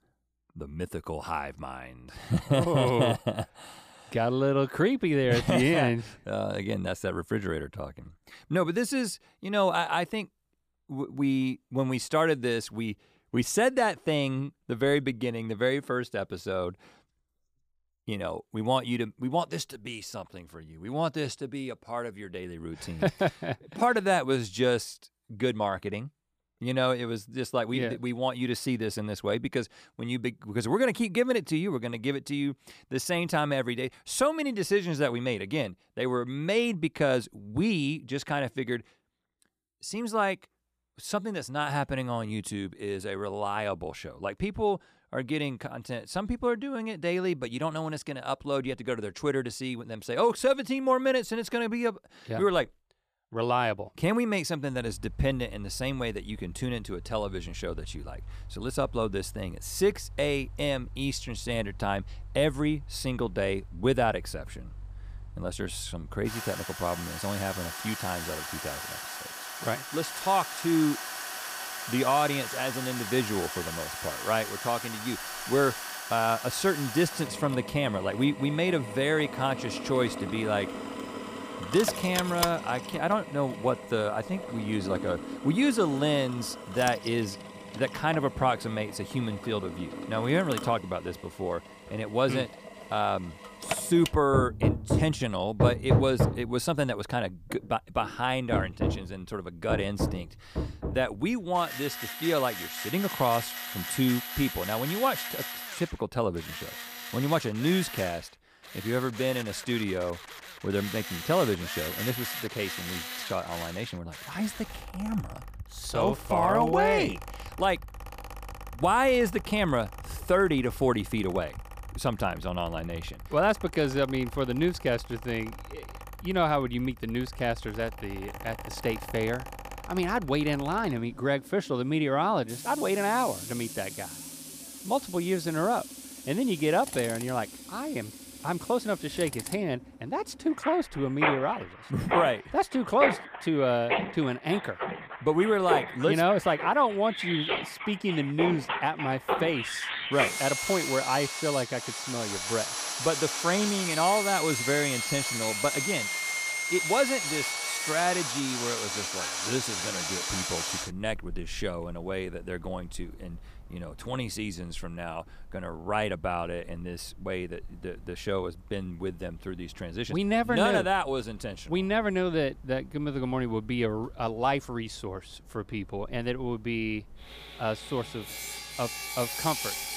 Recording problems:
machinery noise; loud; from 55 s on; 5 dB below the speech

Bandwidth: 15 kHz